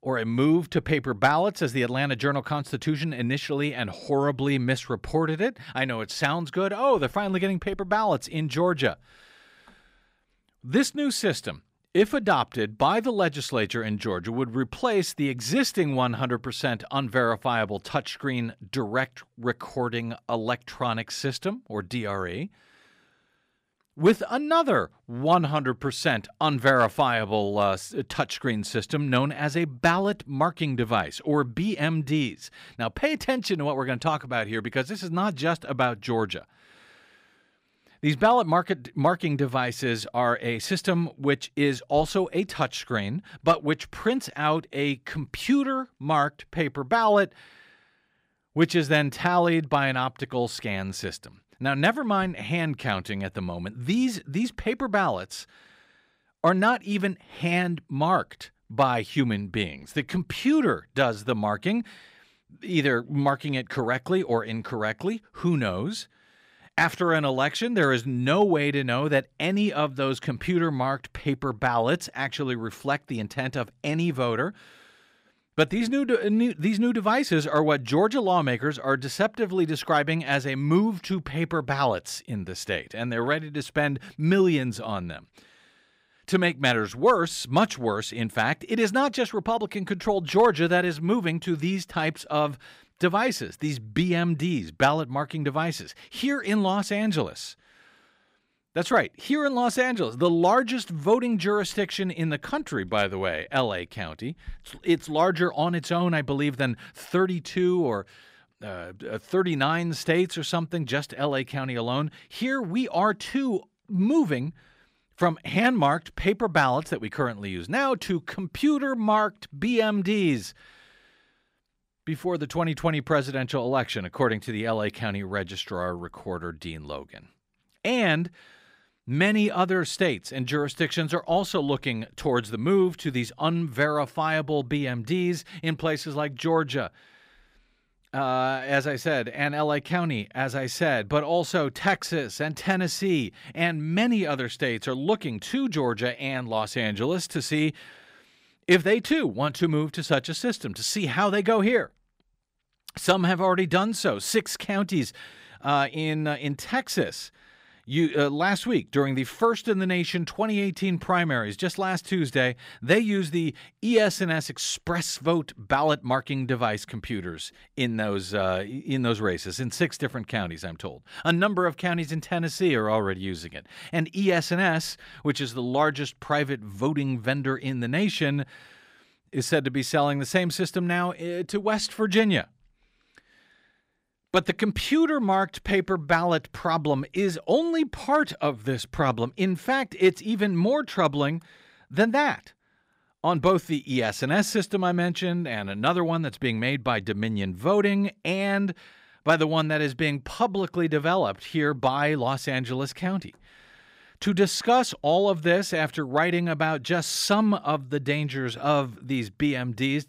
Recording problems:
none

